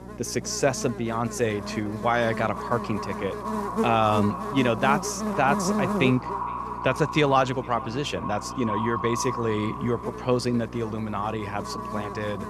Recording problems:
echo of what is said; strong; throughout; 460 ms later, 9 dB below the speech
electrical hum; loud; throughout; 60 Hz, 10 dB below the speech

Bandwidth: 14 kHz